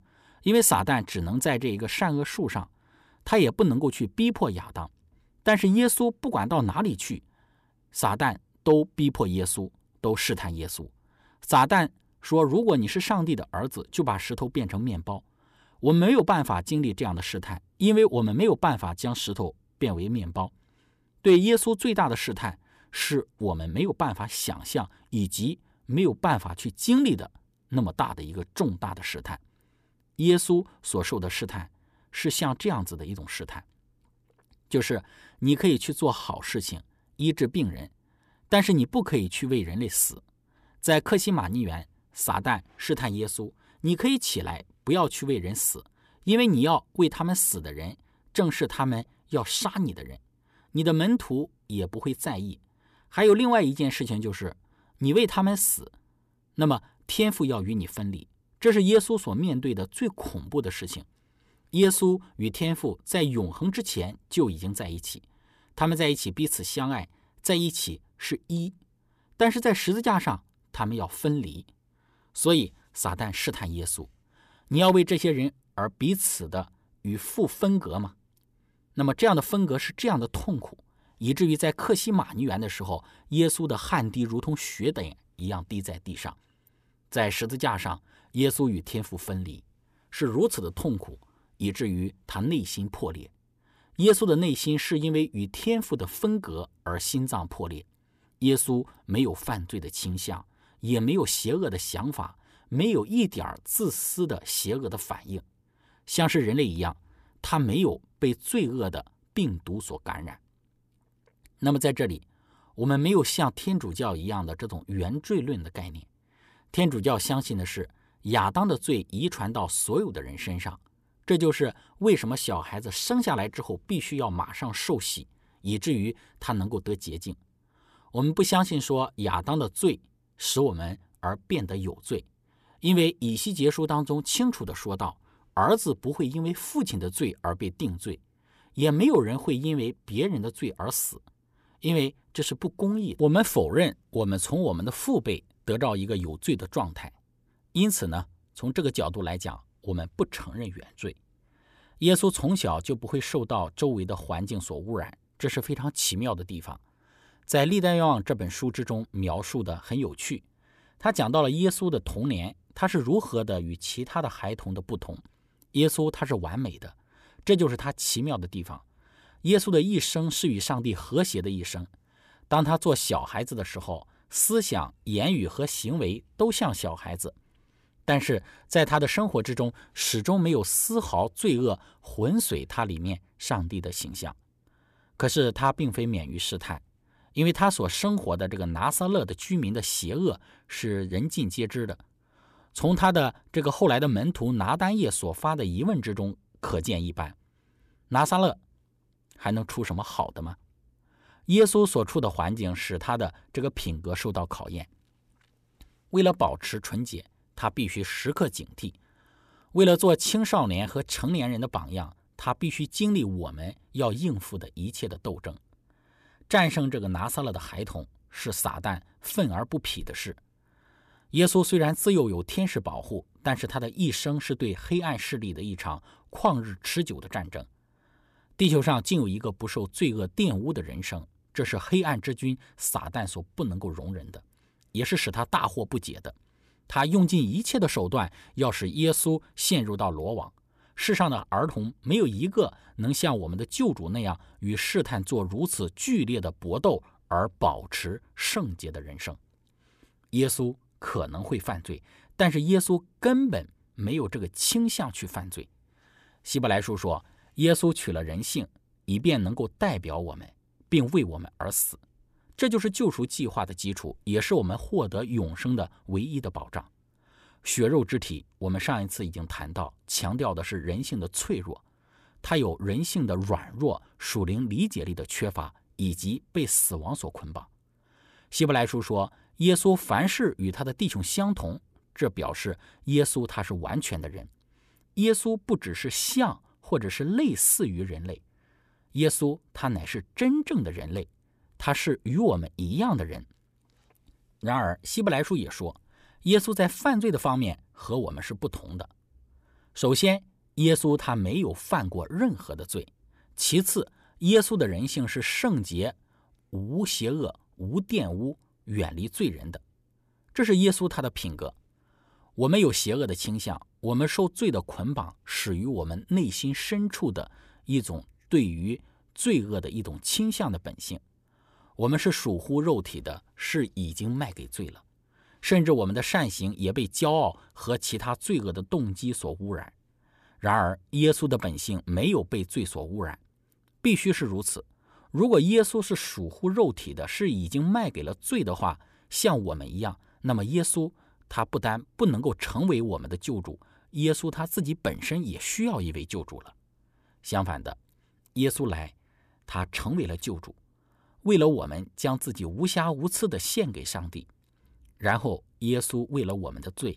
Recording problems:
none

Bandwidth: 14.5 kHz